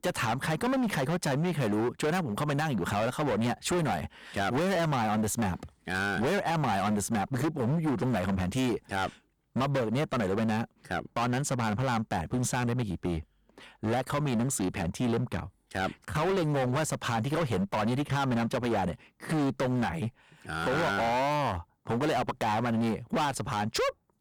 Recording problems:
distortion; heavy; 24% of the sound clipped

